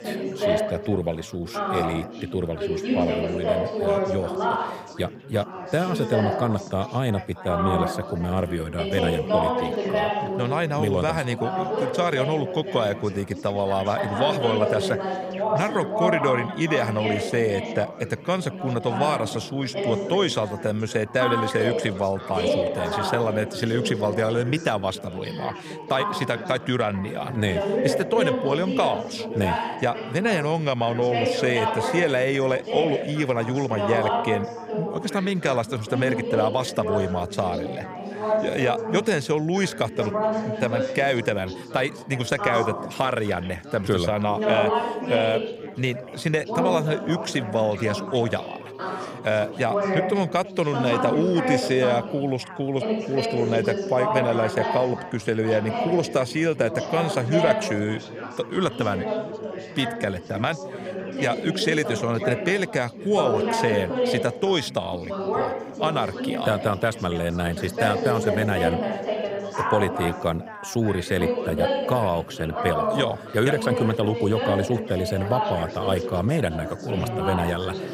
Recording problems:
chatter from many people; loud; throughout; 3 dB below the speech

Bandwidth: 15.5 kHz